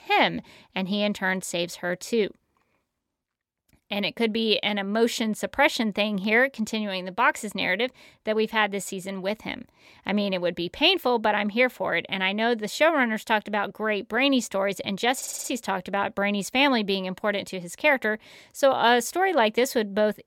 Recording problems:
audio stuttering; at 15 s

